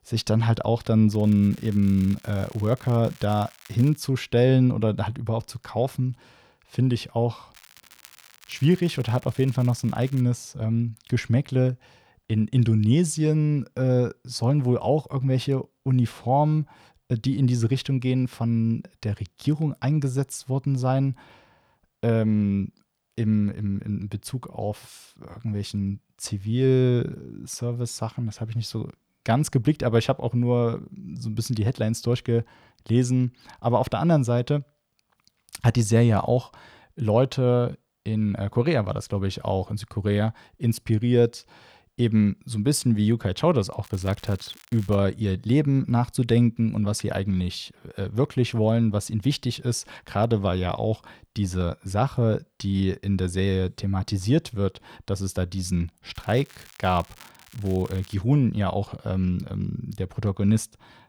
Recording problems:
crackling; faint; 4 times, first at 1 s; 25 dB below the speech

